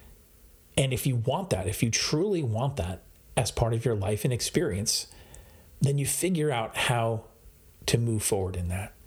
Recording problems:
squashed, flat; somewhat

